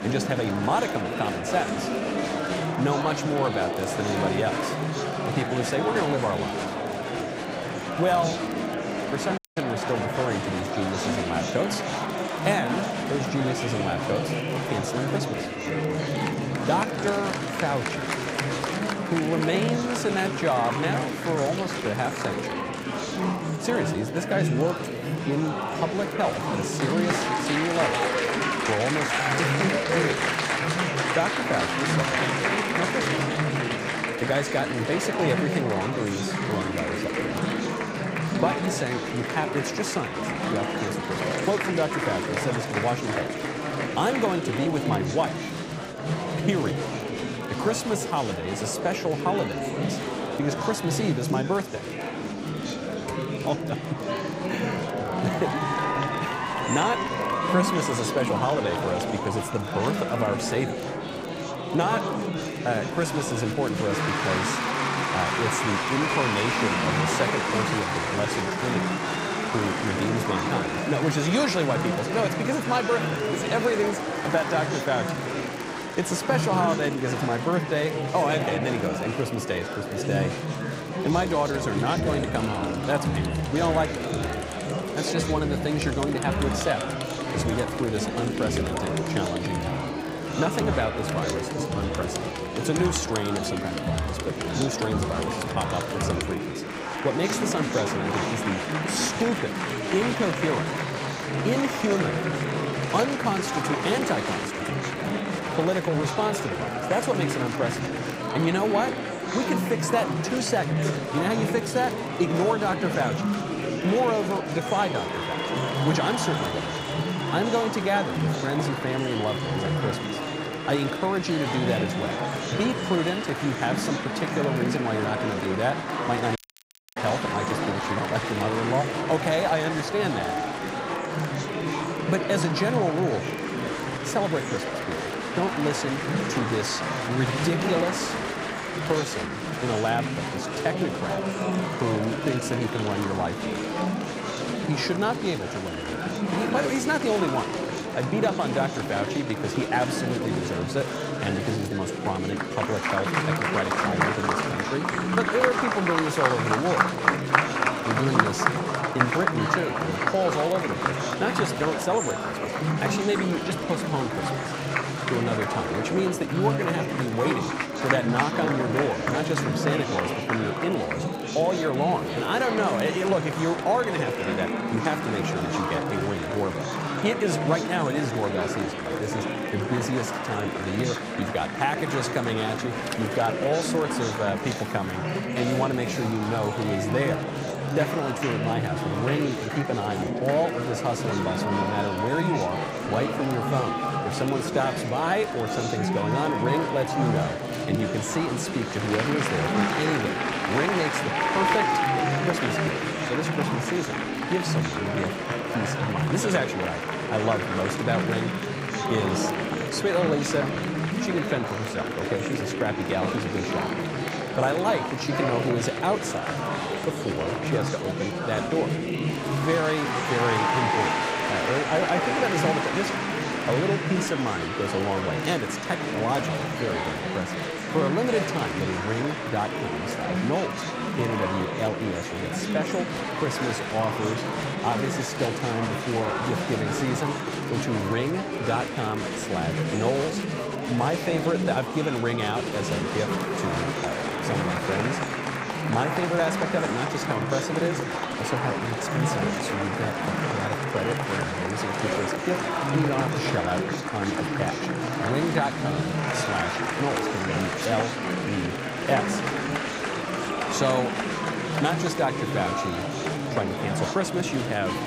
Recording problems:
murmuring crowd; very loud; throughout; 1 dB above the speech
crackle, like an old record; faint; 25 dB below the speech
audio cutting out; at 9.5 s and at 2:06 for 0.5 s

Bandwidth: 15.5 kHz